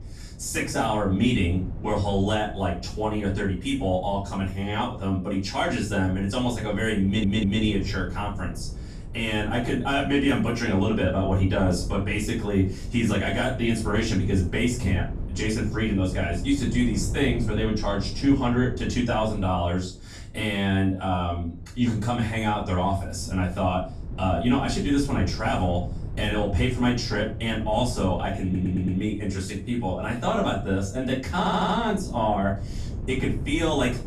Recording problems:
off-mic speech; far
room echo; slight; dies away in 0.4 s
wind noise on the microphone; occasional gusts; 20 dB below the speech
audio stuttering; at 7 s, at 28 s and at 31 s

